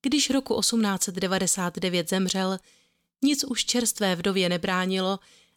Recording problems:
none

